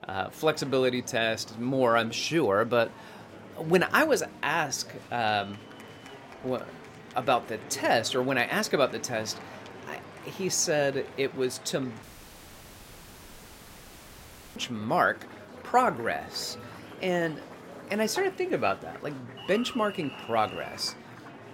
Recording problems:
murmuring crowd; noticeable; throughout; 15 dB below the speech
audio cutting out; at 12 s for 2.5 s

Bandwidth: 16 kHz